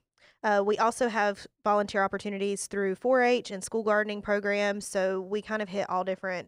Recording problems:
none

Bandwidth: 15.5 kHz